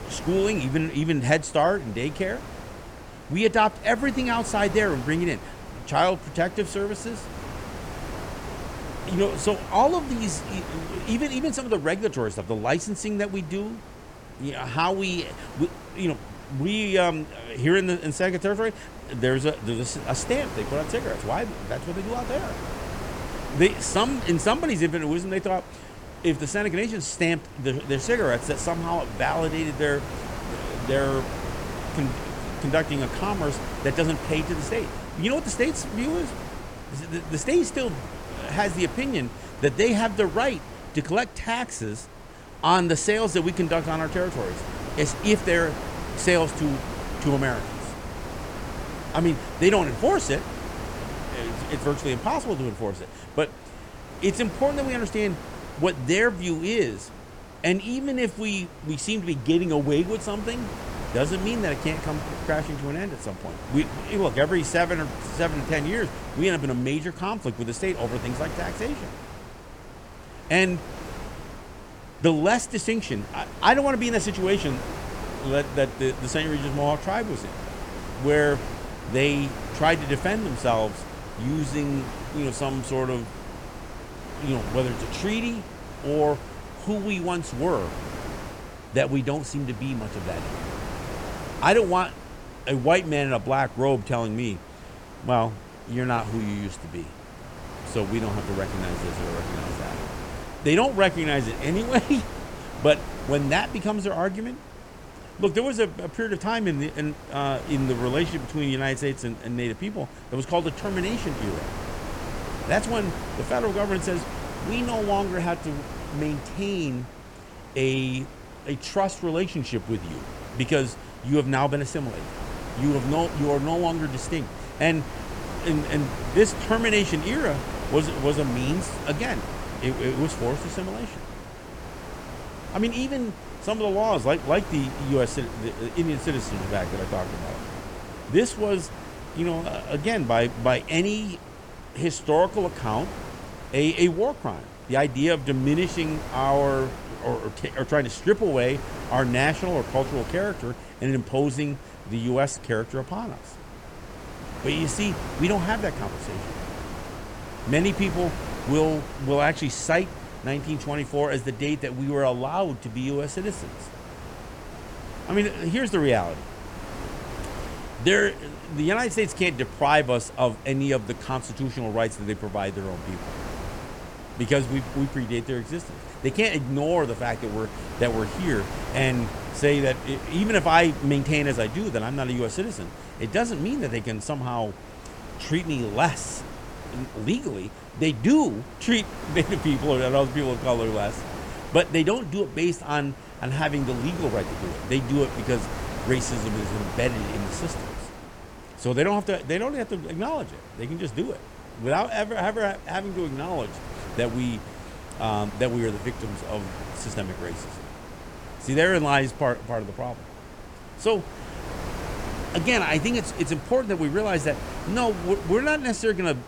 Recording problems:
wind noise on the microphone; occasional gusts; 10 dB below the speech

